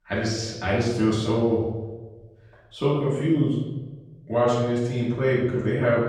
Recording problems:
off-mic speech; far
room echo; noticeable; dies away in 1 s

